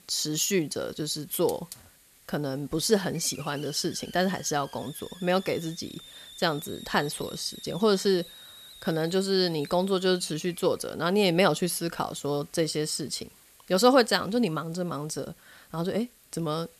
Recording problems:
hiss; noticeable; throughout; 20 dB below the speech

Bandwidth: 14 kHz